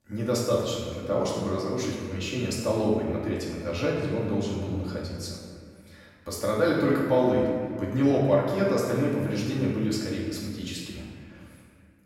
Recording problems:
off-mic speech; far
room echo; noticeable; dies away in 1.8 s

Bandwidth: 16 kHz